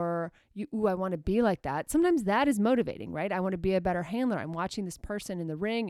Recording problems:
abrupt cut into speech; at the start and the end

